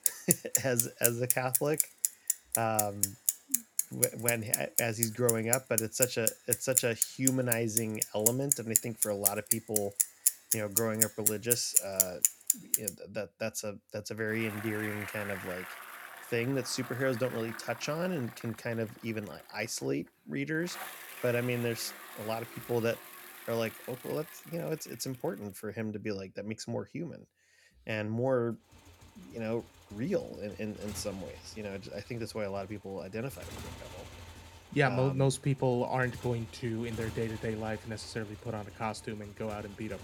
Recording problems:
traffic noise; very loud; throughout; 4 dB above the speech

